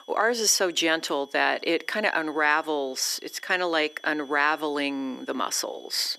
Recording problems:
thin; somewhat; fading below 300 Hz
high-pitched whine; faint; throughout; 3.5 kHz, 25 dB below the speech

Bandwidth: 14.5 kHz